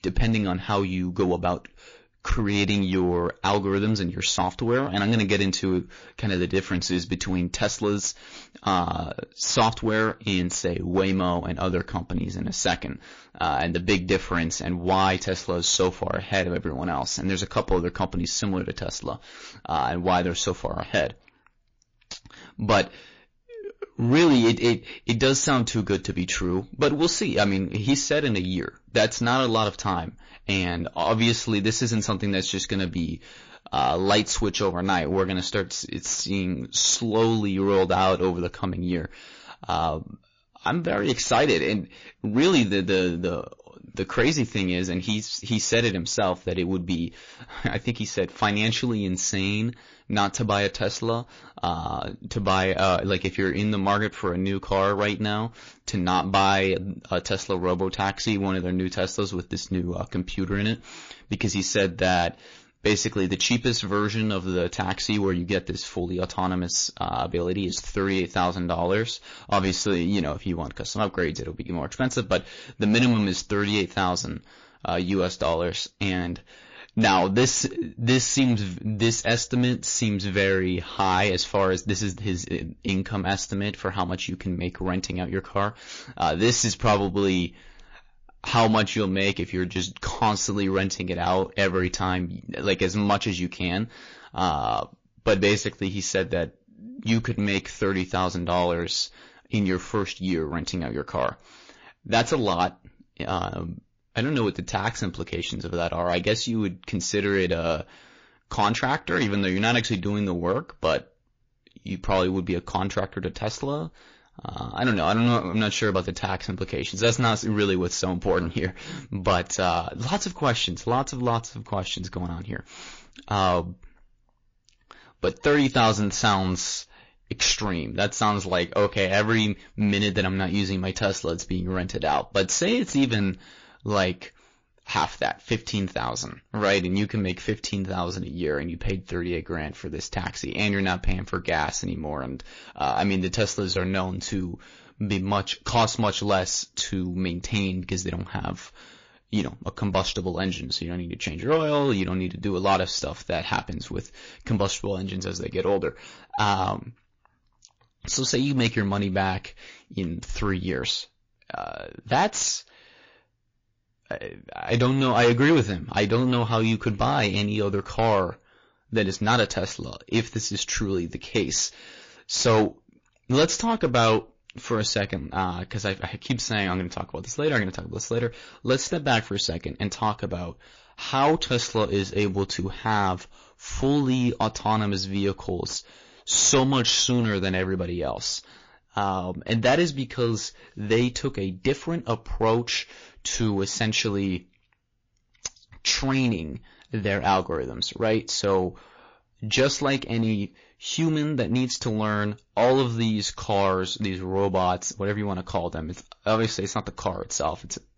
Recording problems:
distortion; slight; 3% of the sound clipped
garbled, watery; slightly

